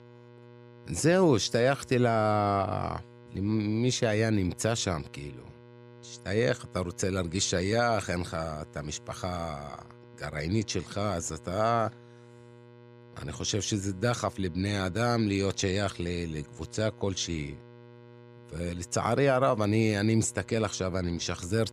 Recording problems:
electrical hum; faint; throughout; 60 Hz, 25 dB below the speech

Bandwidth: 15 kHz